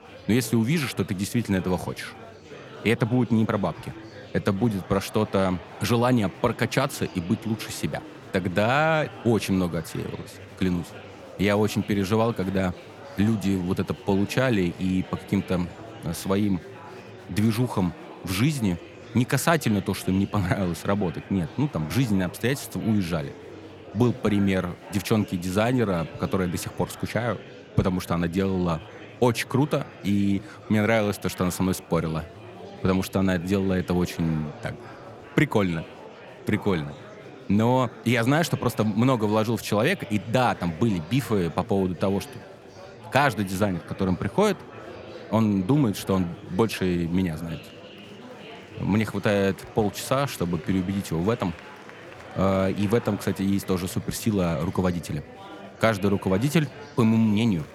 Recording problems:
murmuring crowd; noticeable; throughout; 15 dB below the speech

